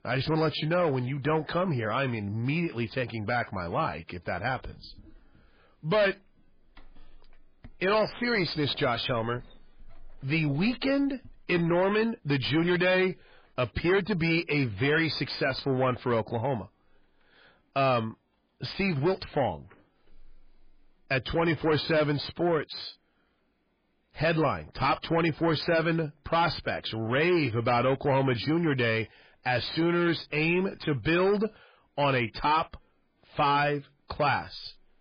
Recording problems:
distortion; heavy; 8 dB below the speech
garbled, watery; badly

